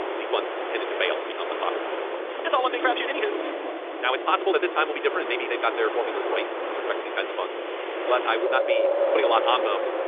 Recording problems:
wrong speed, natural pitch; too fast; 1.7 times normal speed
phone-call audio; nothing above 3.5 kHz
wind in the background; loud; throughout; 2 dB below the speech
rain or running water; faint; from 7 s on; 25 dB below the speech

